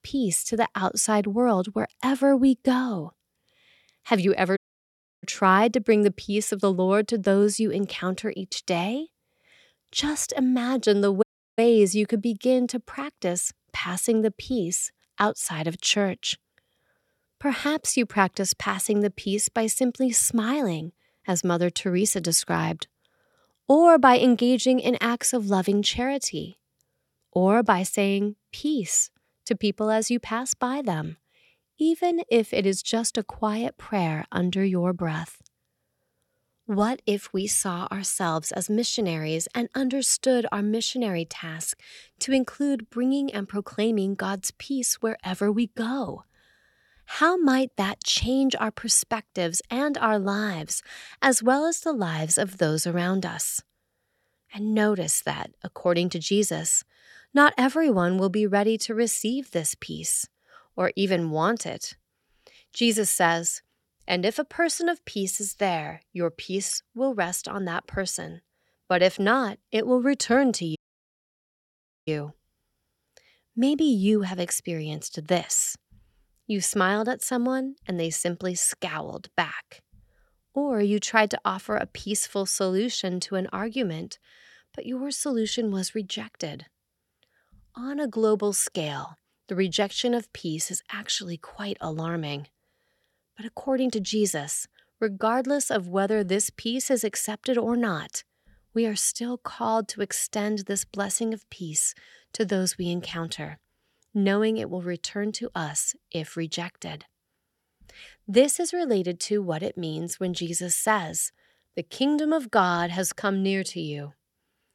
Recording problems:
audio cutting out; at 4.5 s for 0.5 s, at 11 s and at 1:11 for 1.5 s

